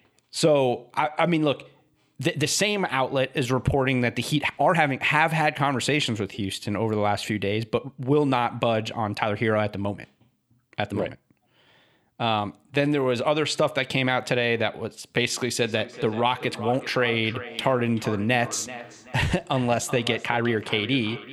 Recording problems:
echo of what is said; noticeable; from 16 s on; 380 ms later, 15 dB below the speech
uneven, jittery; strongly; from 1 to 21 s

